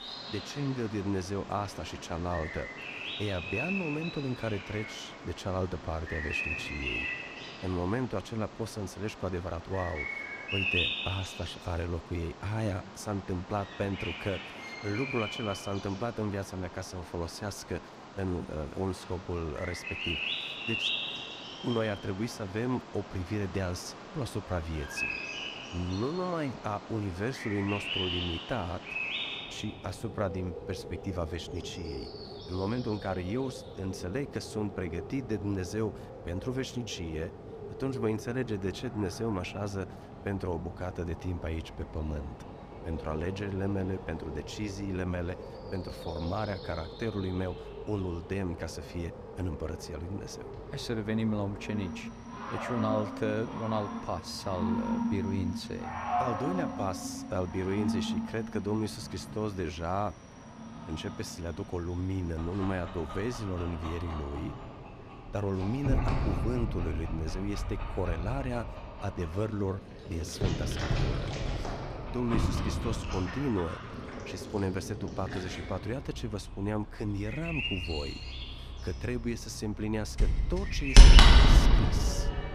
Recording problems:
animal sounds; very loud; throughout; 2 dB above the speech

